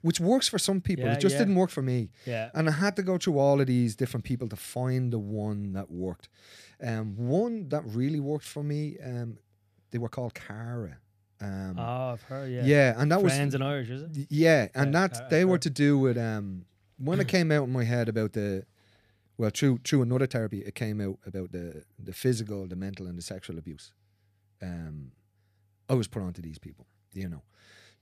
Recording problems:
uneven, jittery; strongly; from 2.5 to 27 s

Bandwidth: 14.5 kHz